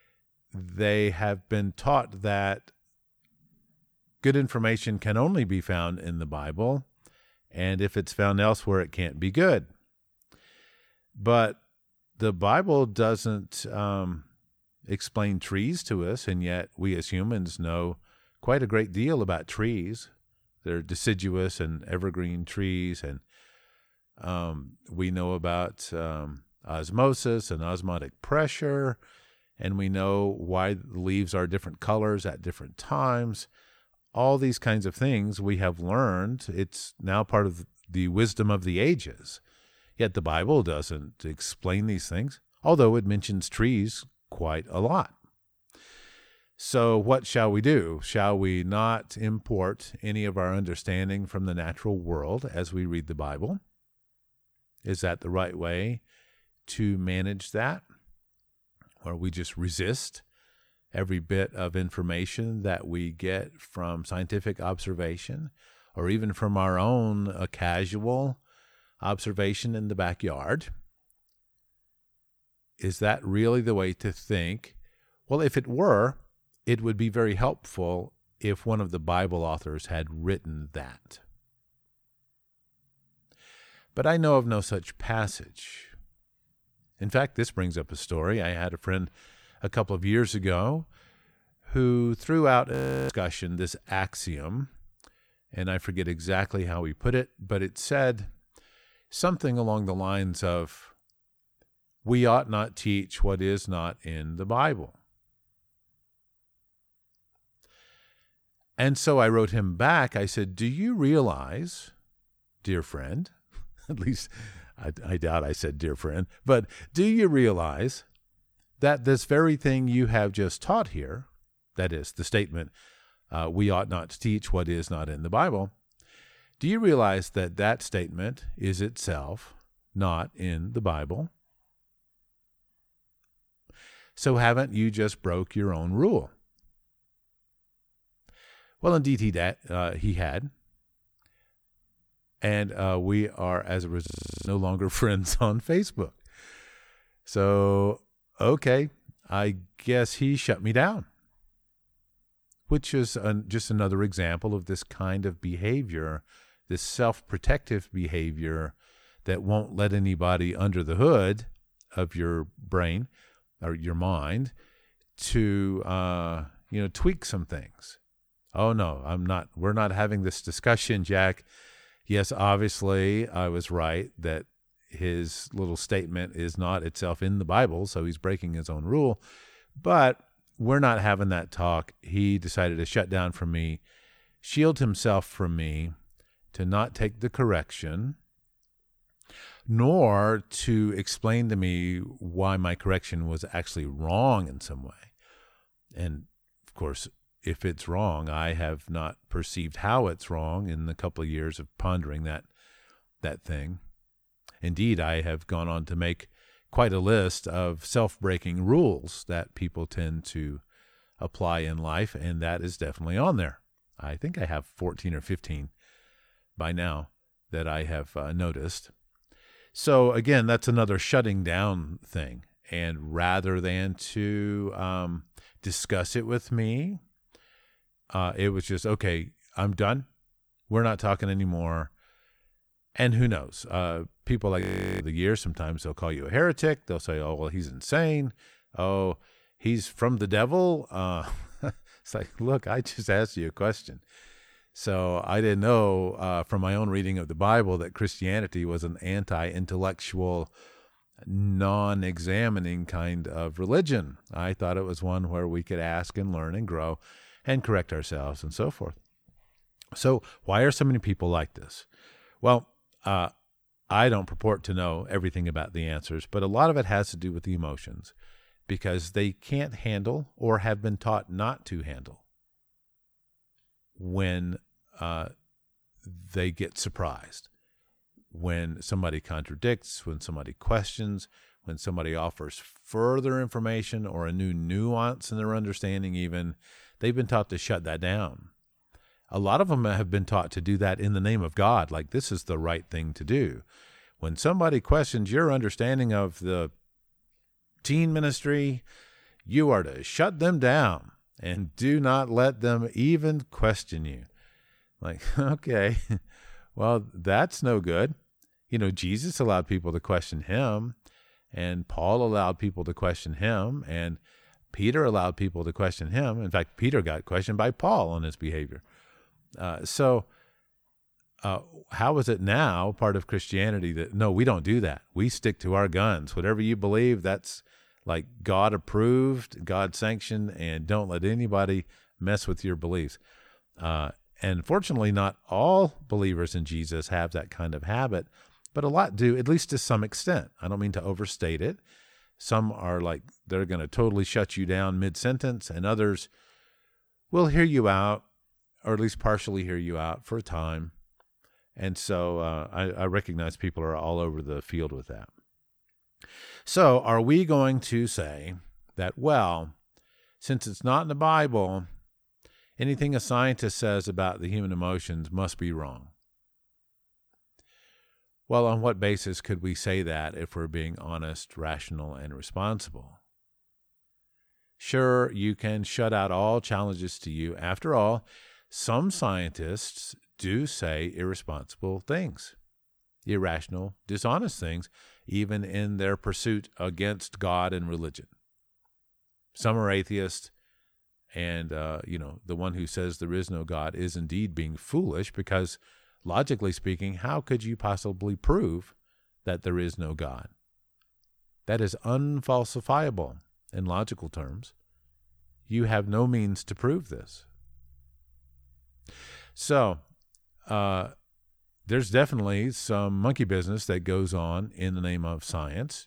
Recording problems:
audio freezing; at 1:33, at 2:24 and at 3:55

